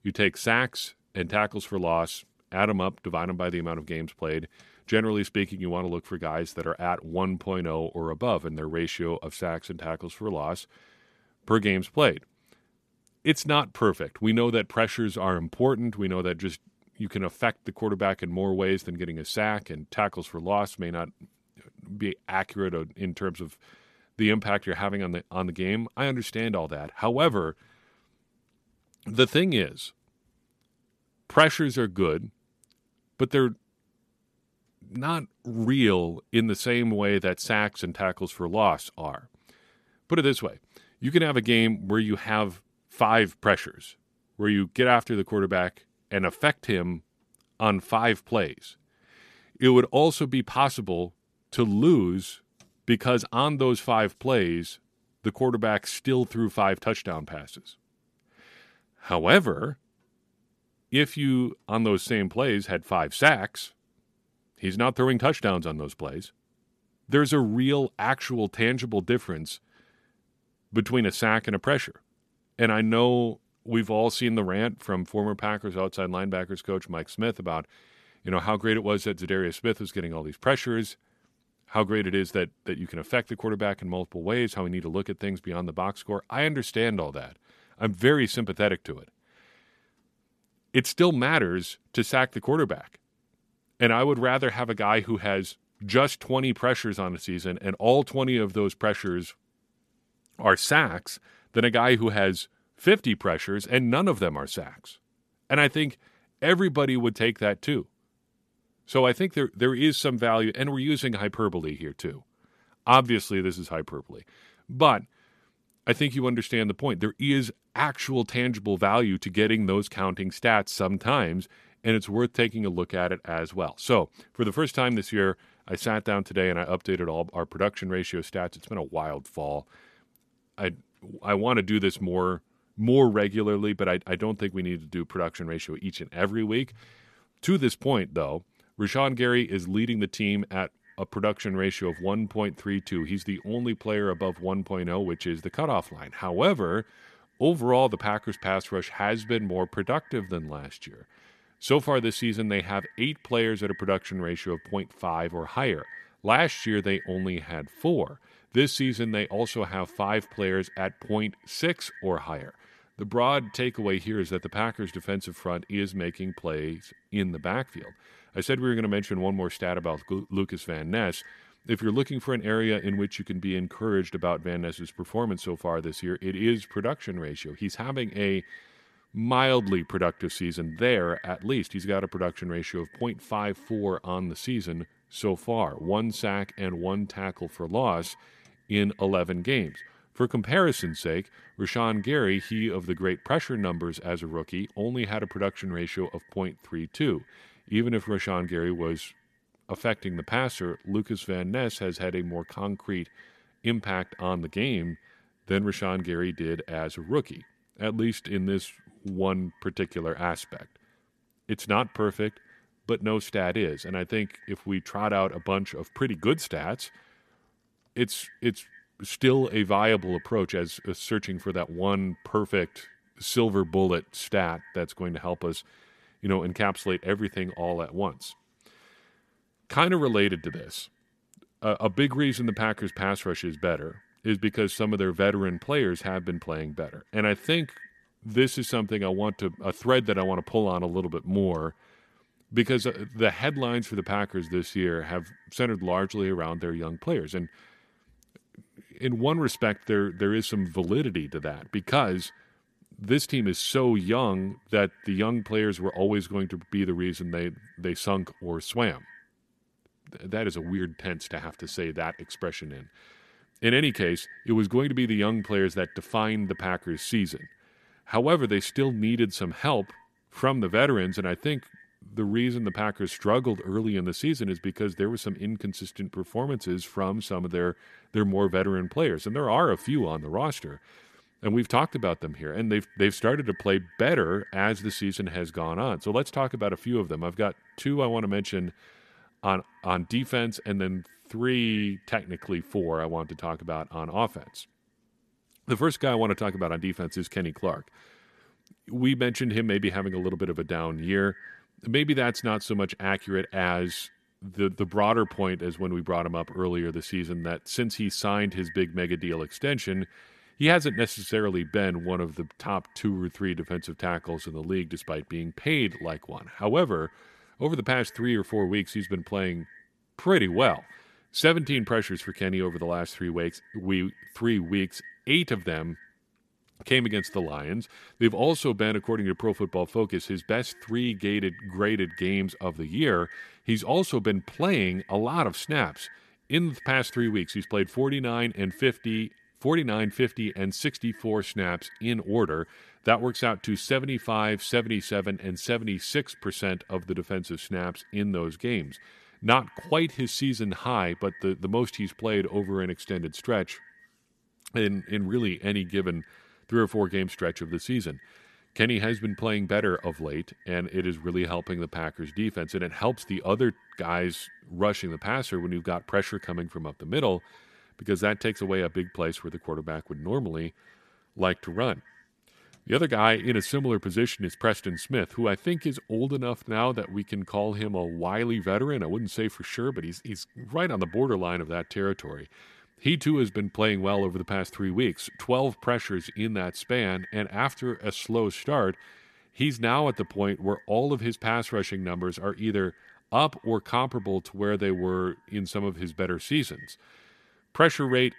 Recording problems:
echo of what is said; faint; from 2:21 on; 90 ms later, 25 dB below the speech

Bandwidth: 14 kHz